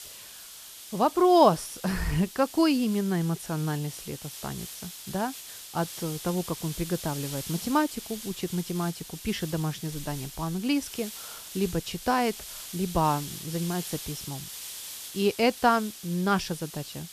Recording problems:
hiss; noticeable; throughout; 10 dB below the speech

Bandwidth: 14.5 kHz